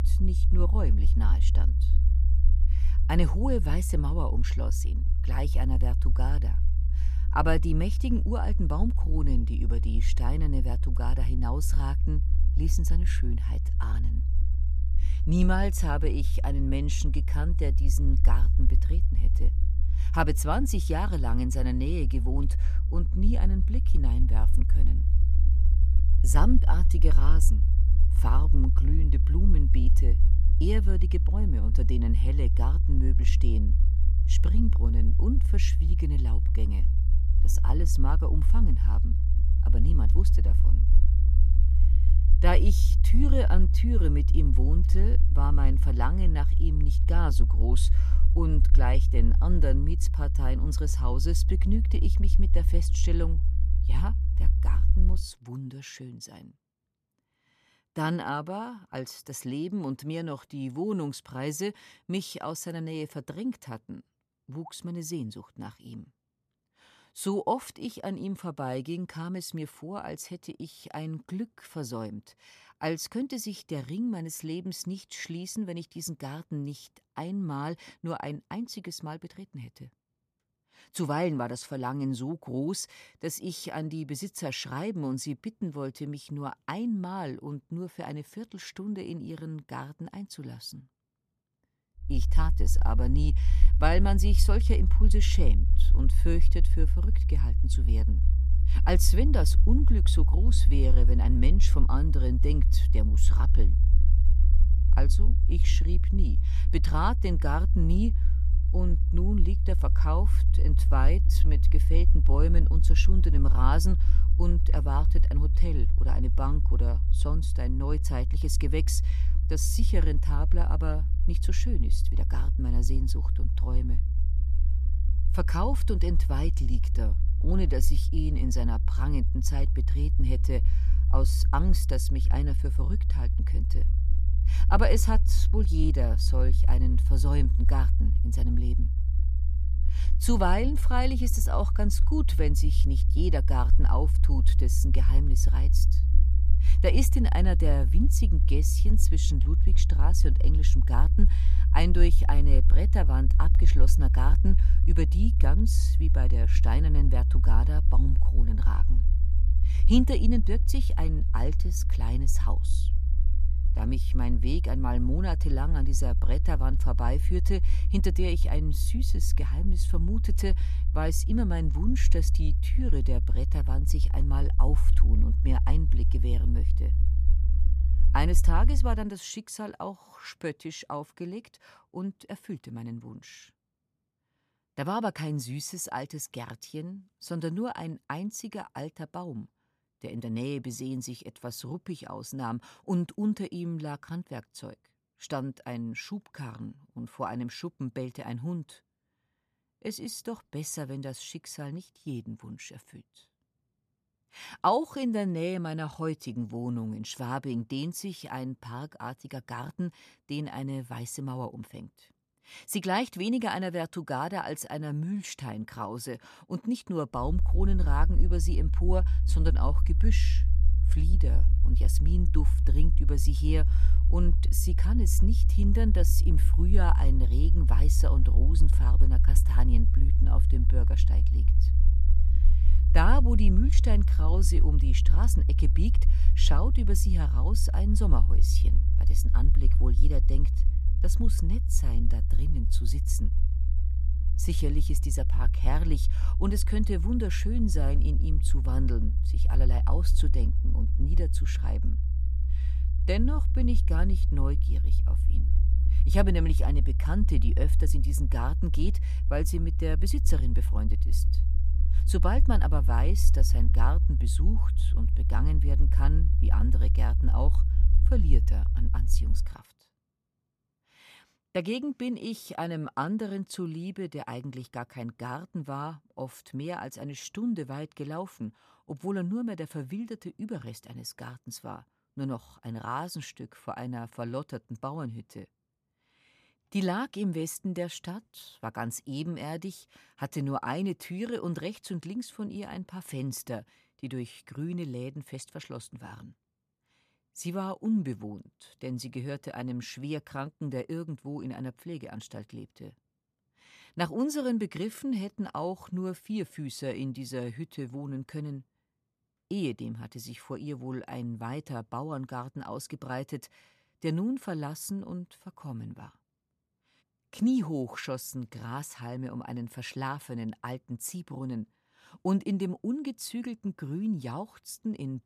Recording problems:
low rumble; loud; until 55 s, from 1:32 to 2:59 and from 3:37 to 4:29; 9 dB below the speech

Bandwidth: 14.5 kHz